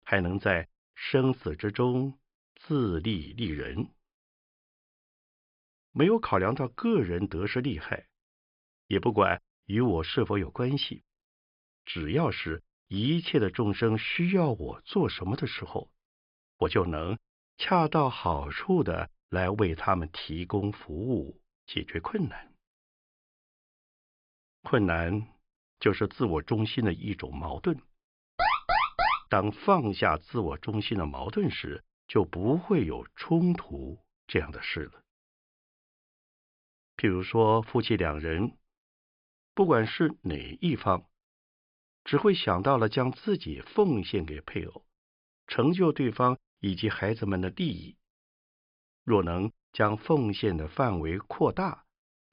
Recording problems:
high frequencies cut off; noticeable; nothing above 5 kHz
alarm; loud; at 28 s; peak 4 dB above the speech

